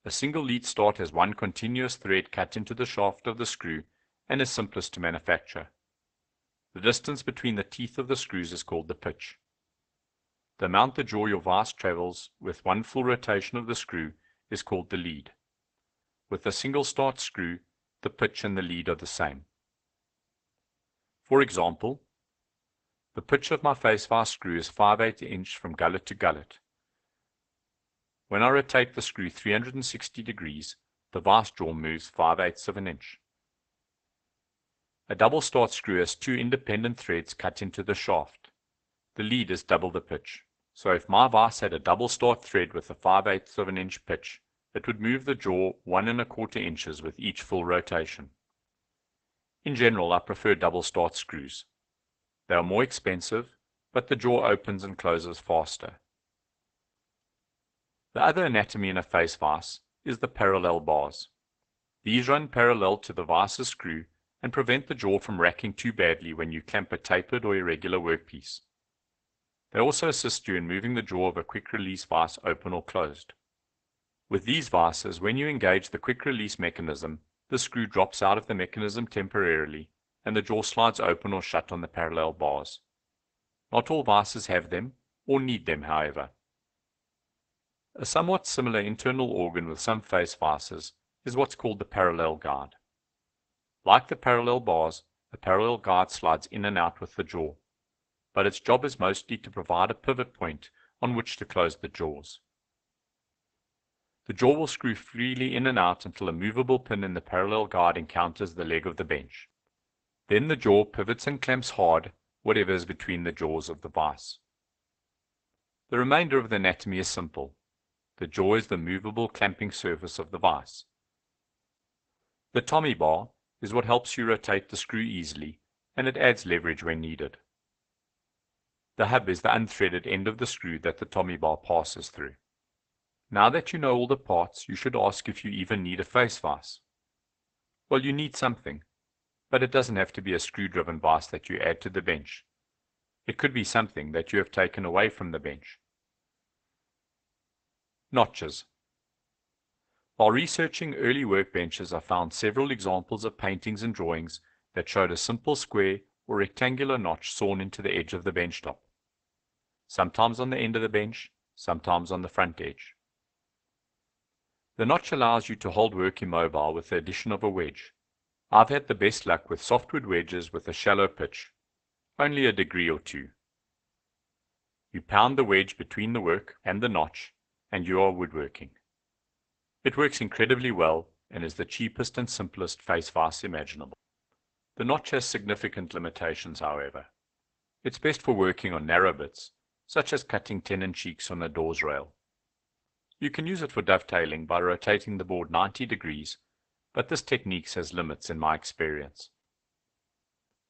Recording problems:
garbled, watery; badly; nothing above 8 kHz

